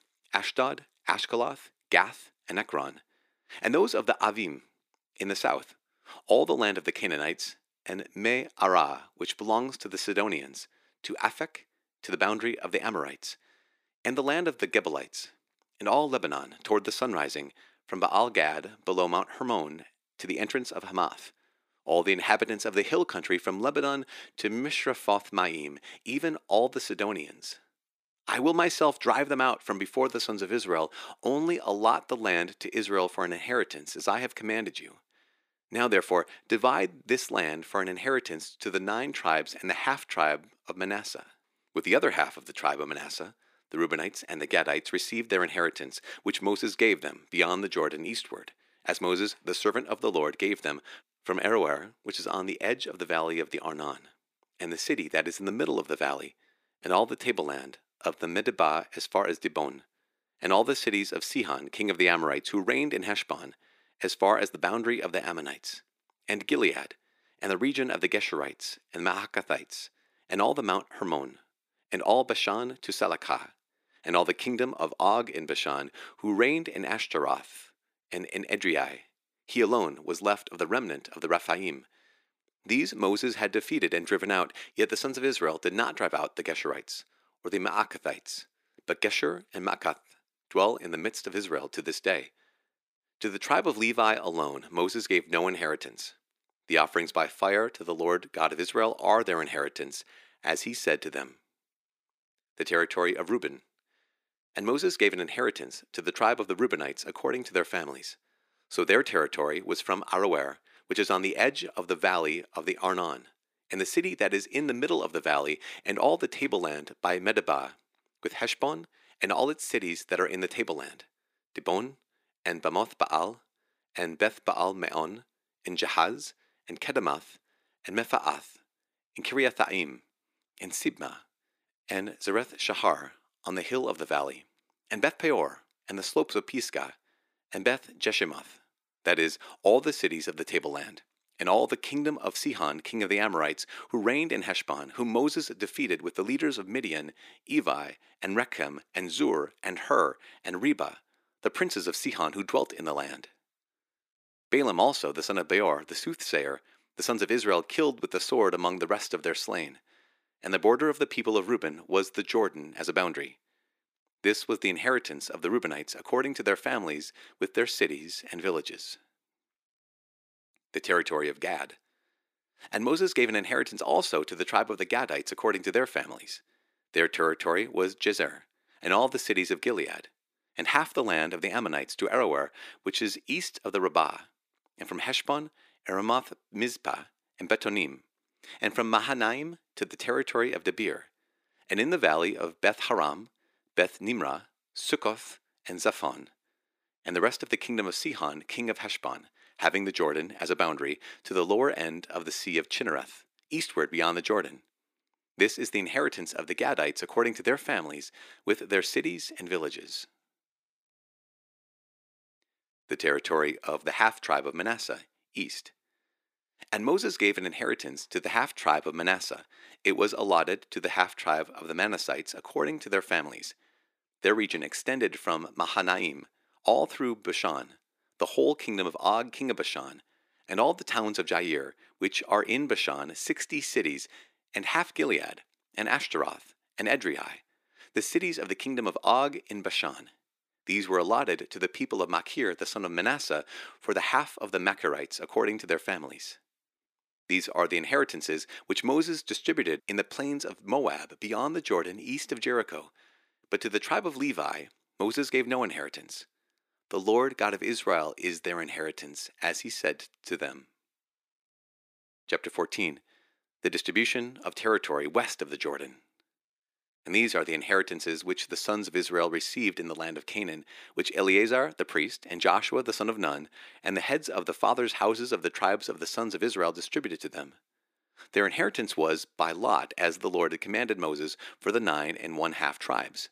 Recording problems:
thin; somewhat; fading below 300 Hz

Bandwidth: 15 kHz